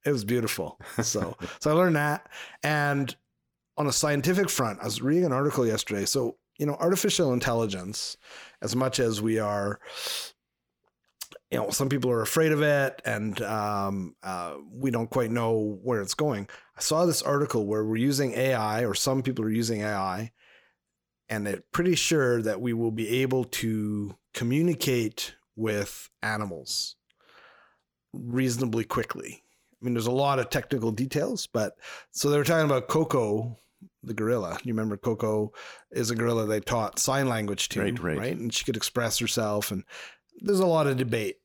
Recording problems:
none

